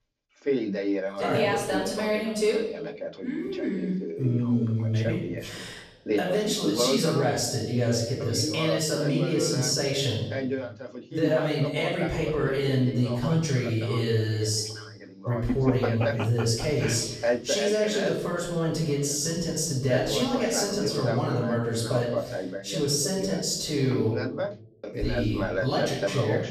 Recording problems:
off-mic speech; far
room echo; noticeable; dies away in 0.9 s
voice in the background; loud; throughout; 6 dB below the speech

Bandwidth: 14.5 kHz